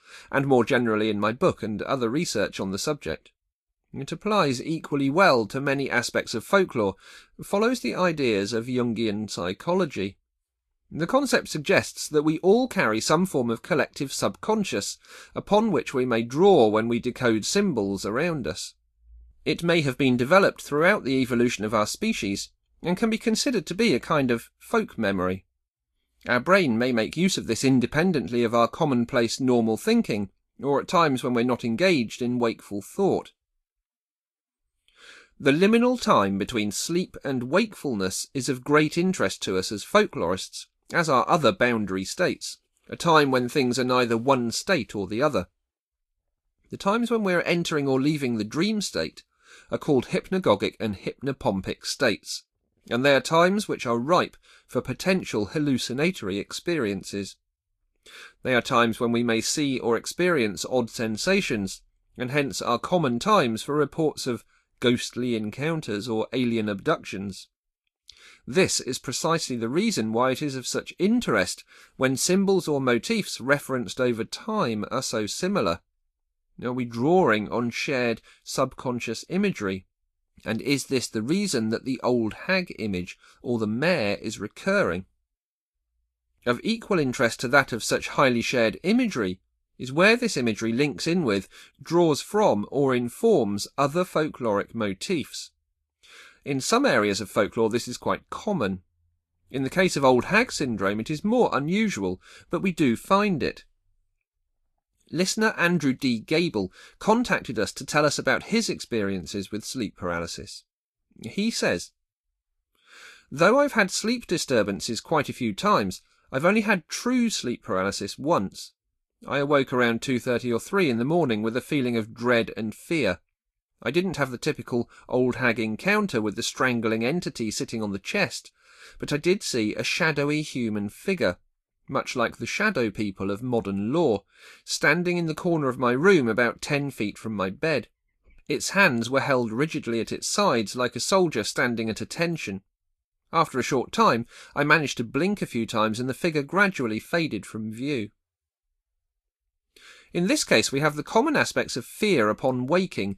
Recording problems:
garbled, watery; slightly; nothing above 12.5 kHz

